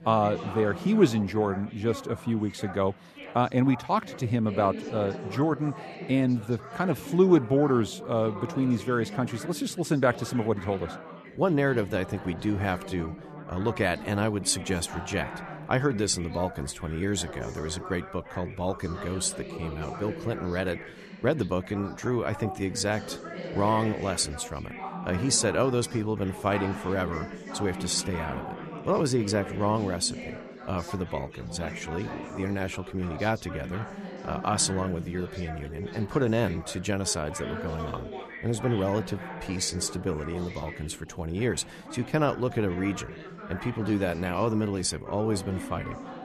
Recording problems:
background chatter; noticeable; throughout; 4 voices, 10 dB below the speech

